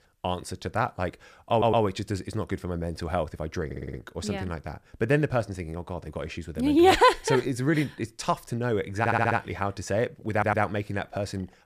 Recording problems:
audio stuttering; 4 times, first at 1.5 s

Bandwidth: 14.5 kHz